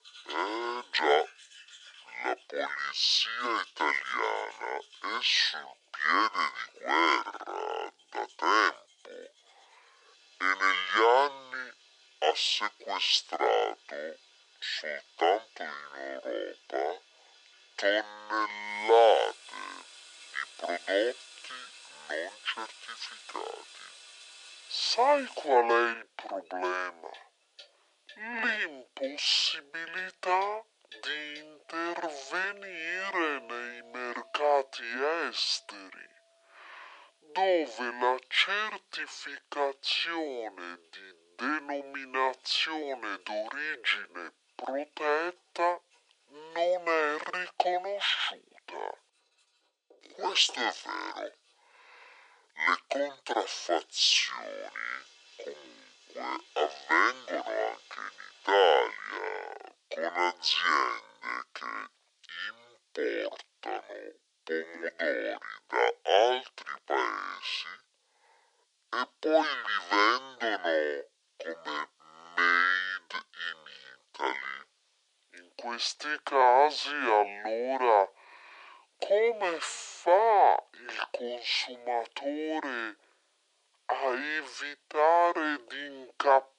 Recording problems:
thin; very; fading below 400 Hz
wrong speed and pitch; too slow and too low; 0.5 times normal speed
household noises; faint; until 59 s; 25 dB below the speech

